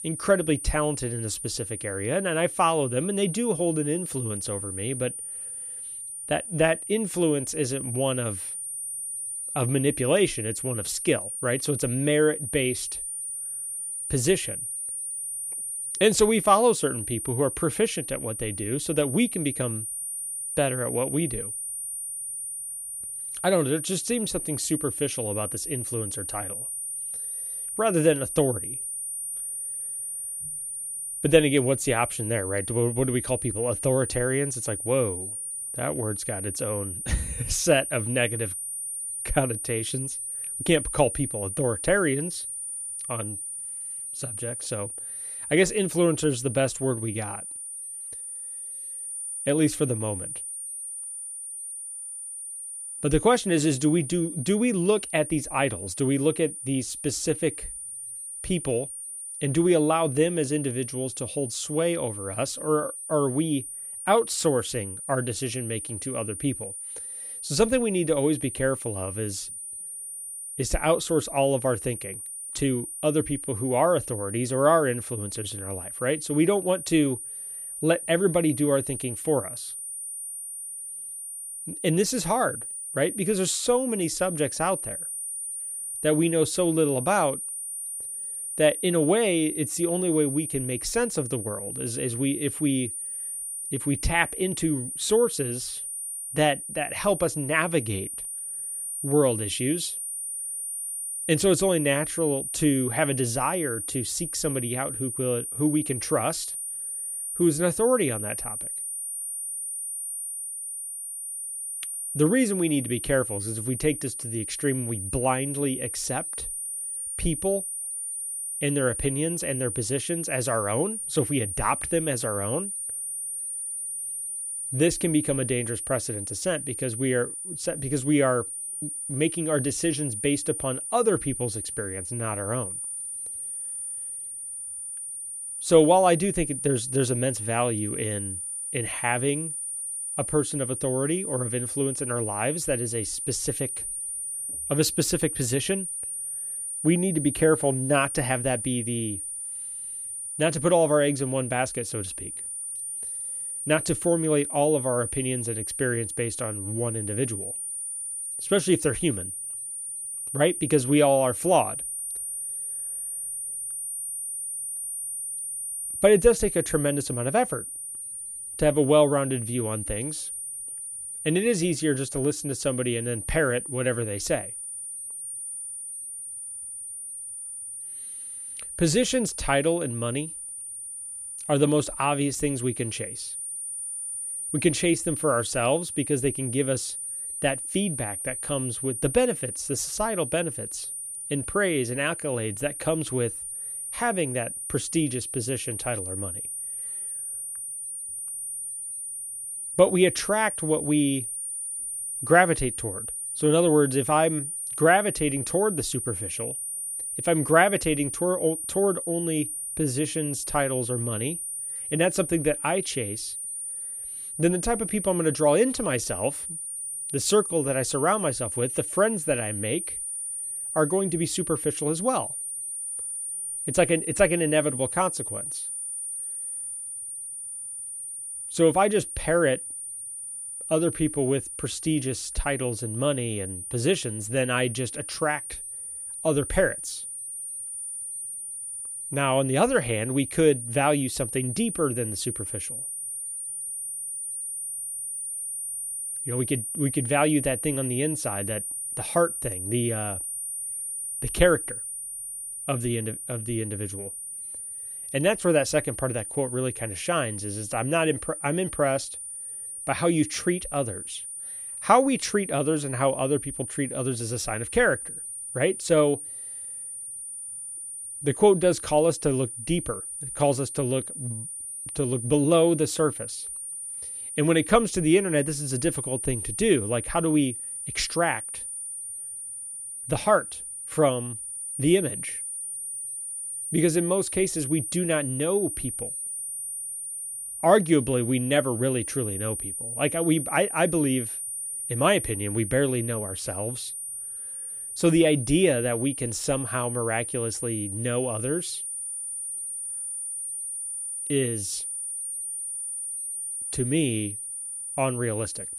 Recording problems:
high-pitched whine; loud; throughout; 9.5 kHz, 5 dB below the speech

